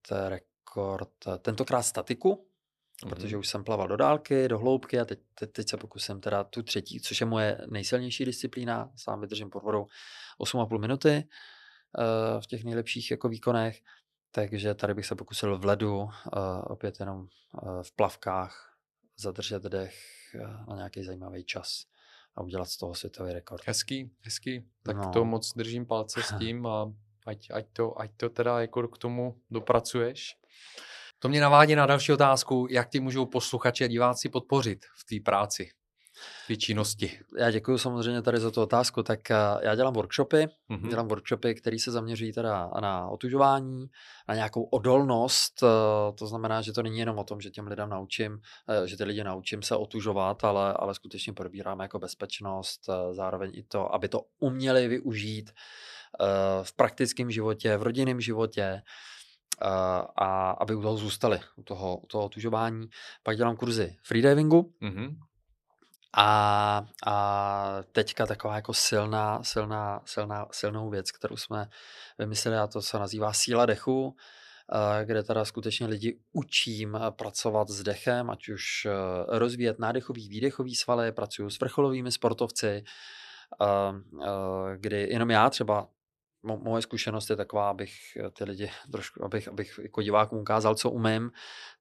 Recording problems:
none

